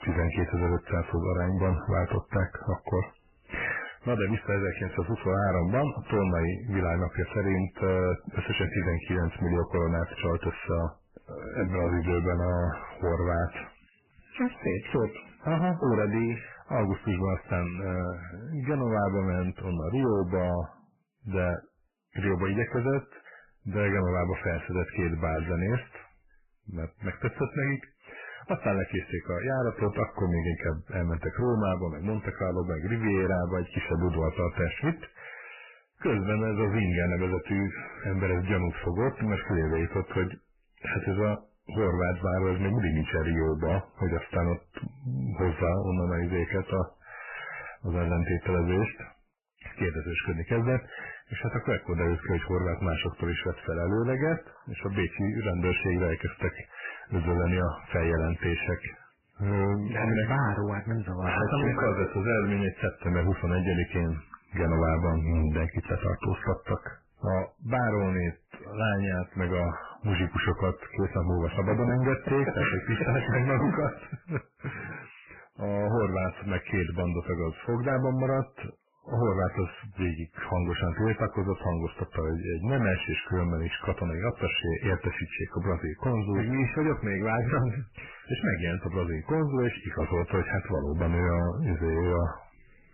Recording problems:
distortion; heavy; 8 dB below the speech
garbled, watery; badly; nothing above 3 kHz

